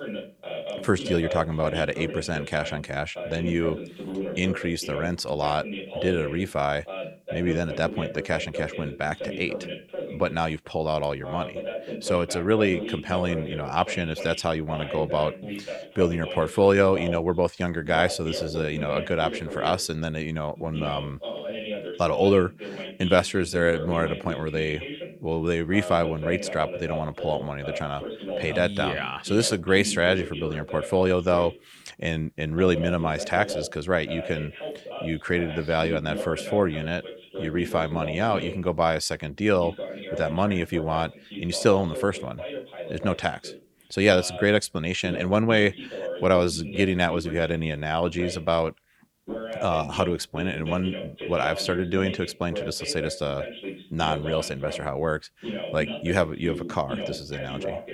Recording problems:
voice in the background; loud; throughout; 9 dB below the speech

